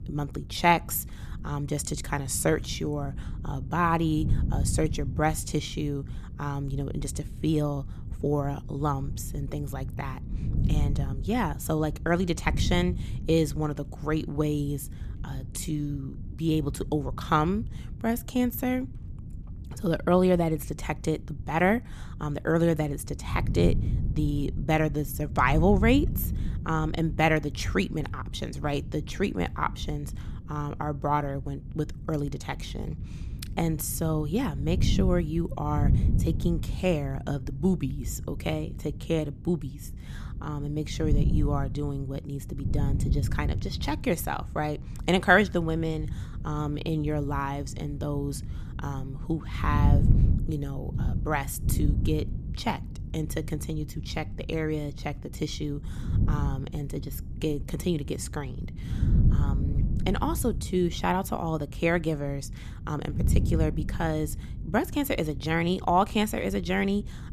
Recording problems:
wind noise on the microphone; occasional gusts; 15 dB below the speech

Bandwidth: 14.5 kHz